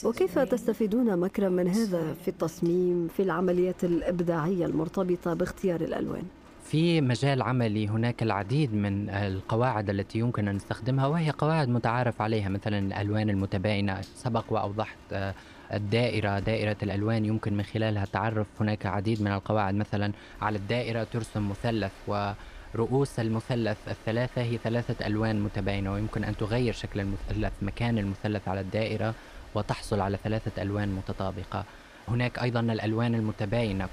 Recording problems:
rain or running water; noticeable; throughout; 20 dB below the speech

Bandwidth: 15 kHz